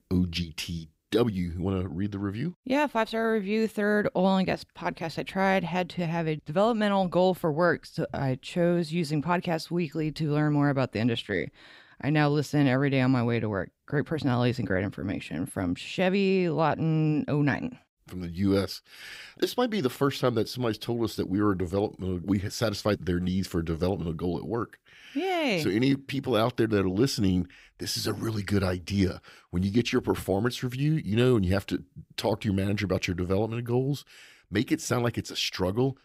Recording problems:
none

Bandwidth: 15.5 kHz